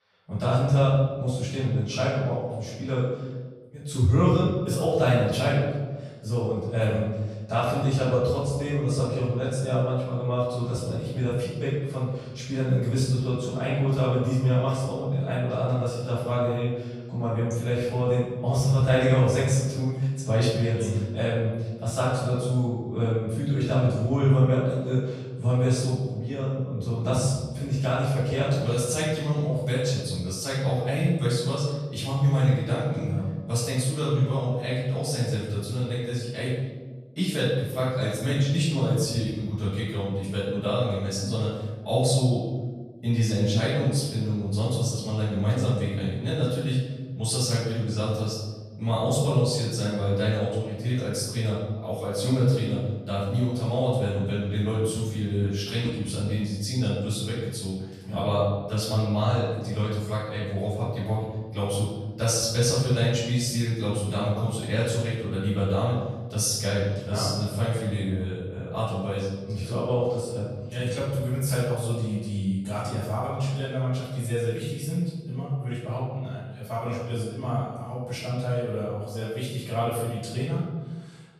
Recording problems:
room echo; strong; dies away in 1.3 s
off-mic speech; far

